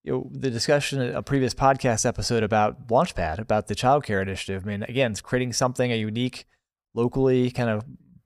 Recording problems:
none

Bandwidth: 15.5 kHz